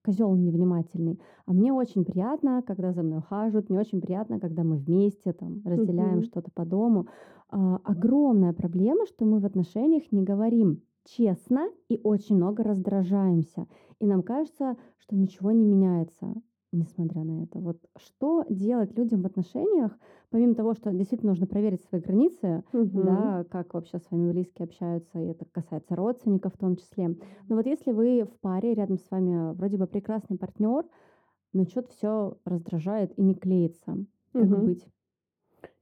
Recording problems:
muffled; very; fading above 1 kHz

